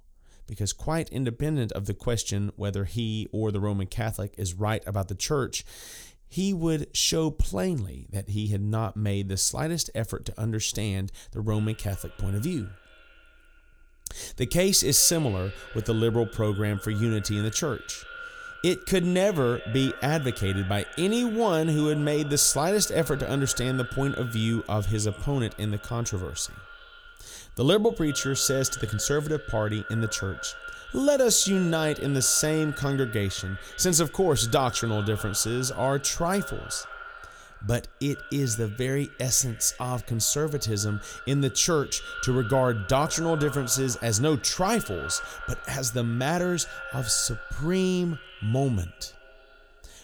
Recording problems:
echo of what is said; noticeable; from 11 s on; 90 ms later, 15 dB below the speech

